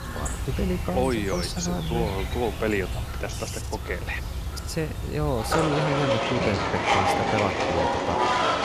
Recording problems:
animal sounds; very loud; throughout; 2 dB above the speech

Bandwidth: 14.5 kHz